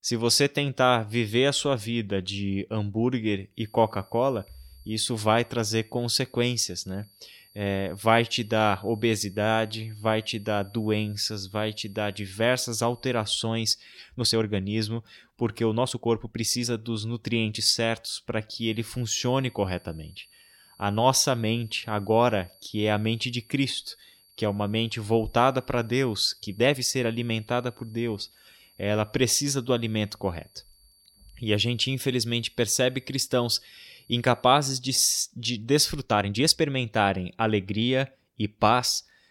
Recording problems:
high-pitched whine; faint; from 3.5 to 13 s and from 19 to 35 s; 4.5 kHz, 30 dB below the speech
uneven, jittery; strongly; from 14 to 37 s

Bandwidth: 16.5 kHz